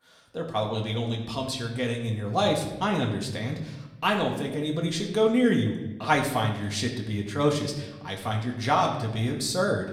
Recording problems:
room echo; slight; dies away in 0.8 s
off-mic speech; somewhat distant

